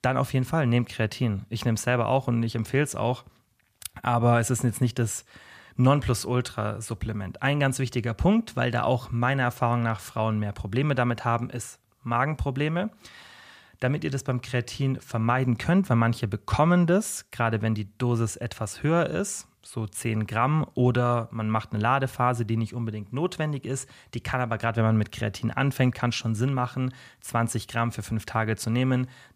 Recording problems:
none

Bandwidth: 14.5 kHz